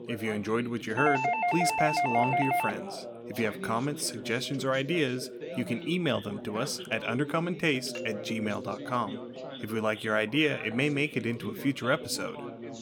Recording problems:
background chatter; noticeable; throughout; 2 voices, 10 dB below the speech
doorbell; loud; from 1 to 2.5 s; peak 3 dB above the speech
doorbell; noticeable; from 8 to 9.5 s; peak 10 dB below the speech

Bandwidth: 17 kHz